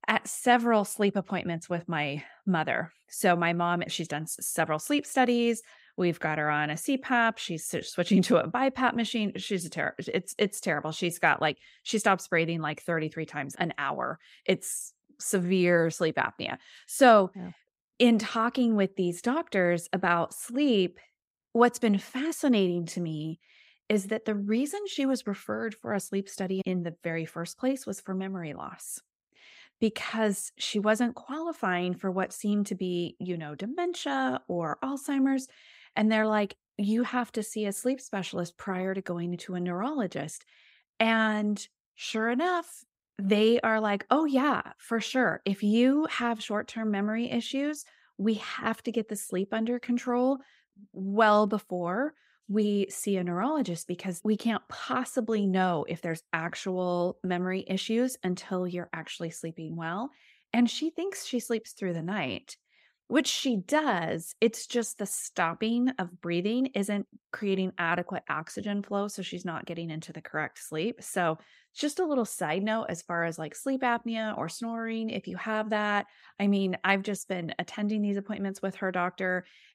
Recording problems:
none

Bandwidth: 15.5 kHz